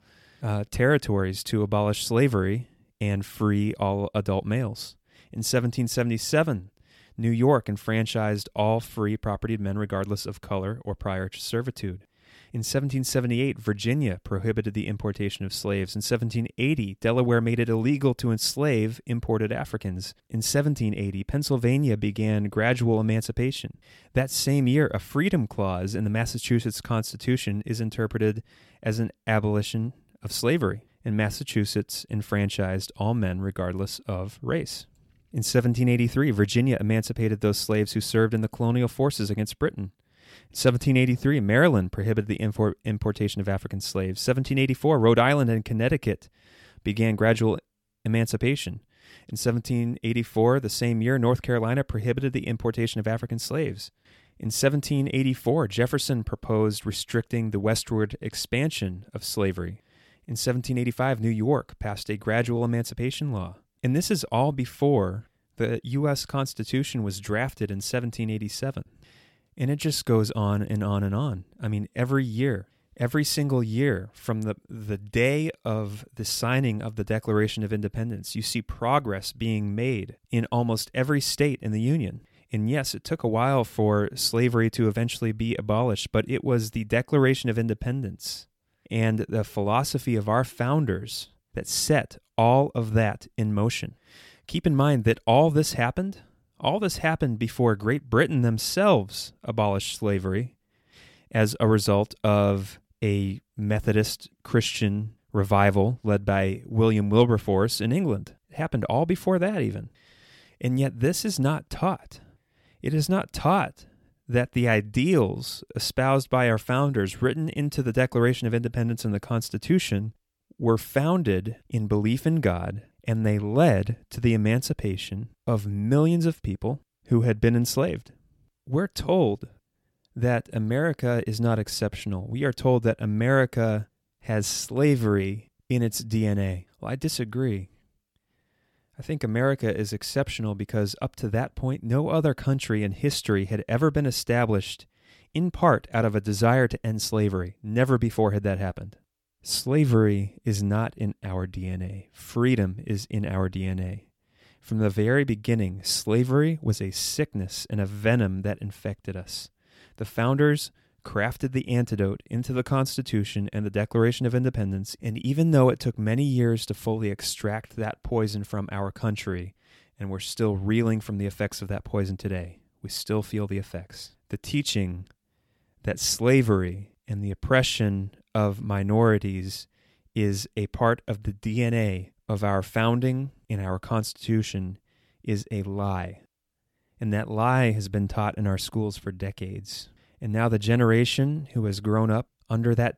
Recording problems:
none

